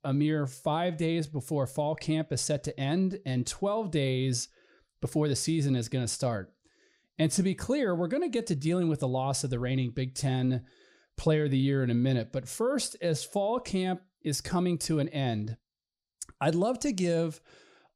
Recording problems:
none

